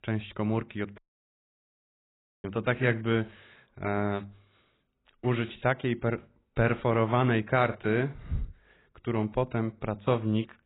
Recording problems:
garbled, watery; badly; nothing above 4 kHz
audio cutting out; at 1 s for 1.5 s

